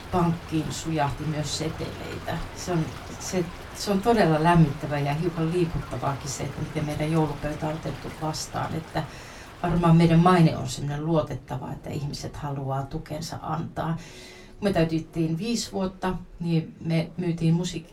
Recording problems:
off-mic speech; far
room echo; very slight; dies away in 0.2 s
rain or running water; noticeable; throughout; 15 dB below the speech
murmuring crowd; faint; throughout; 30 dB below the speech

